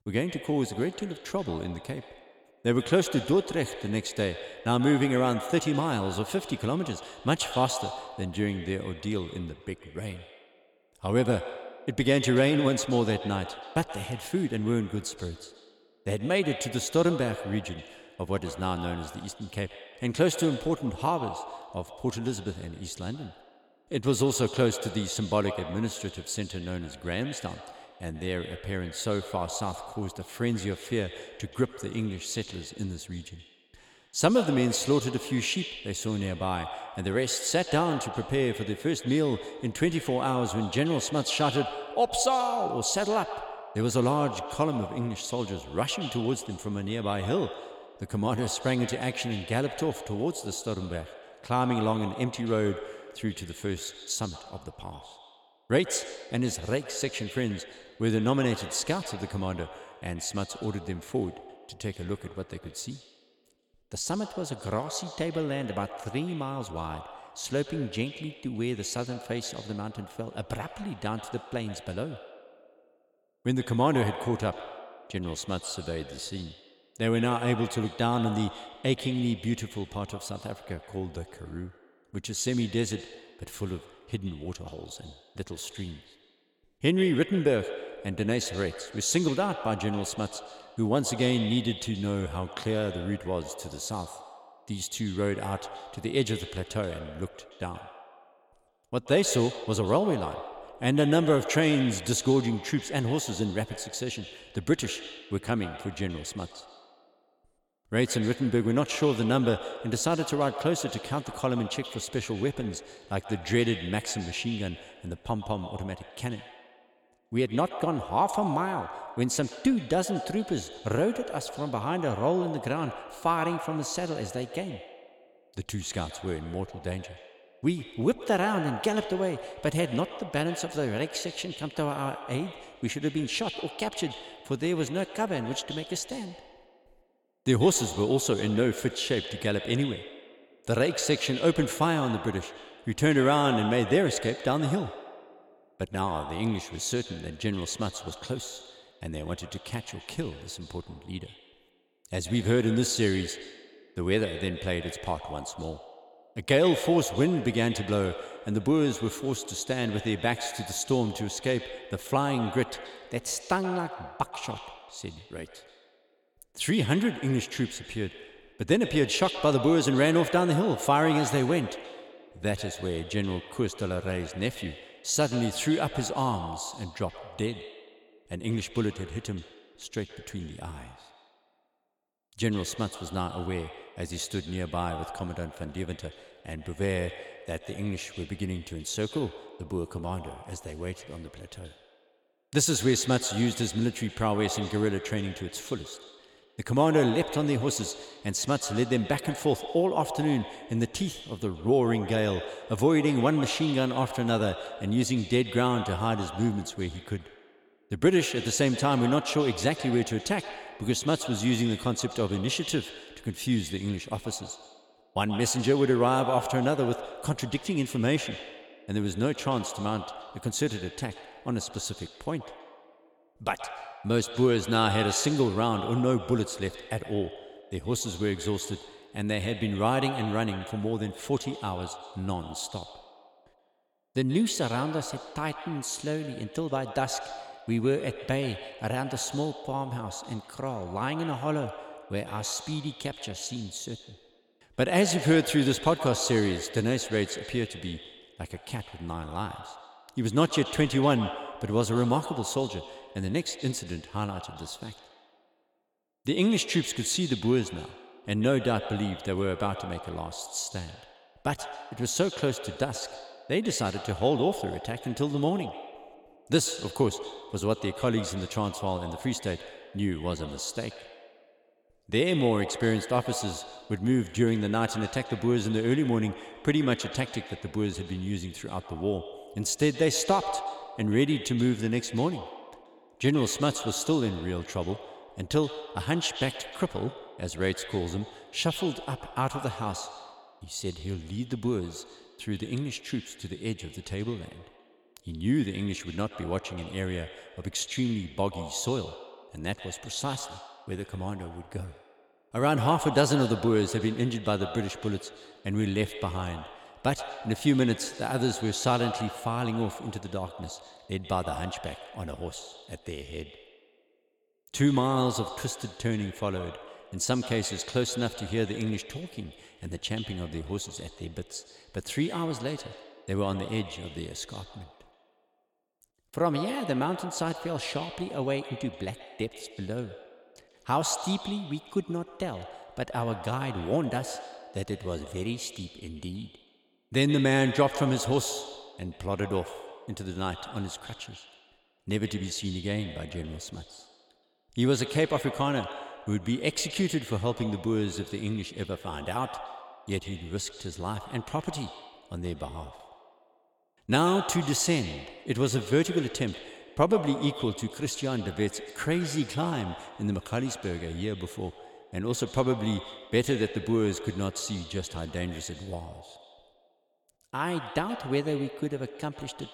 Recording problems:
echo of what is said; strong; throughout; 130 ms later, 10 dB below the speech

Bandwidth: 17.5 kHz